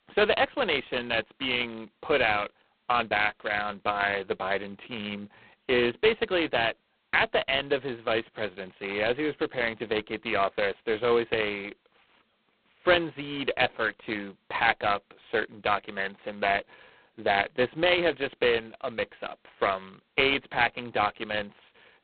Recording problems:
phone-call audio; poor line; nothing above 4 kHz

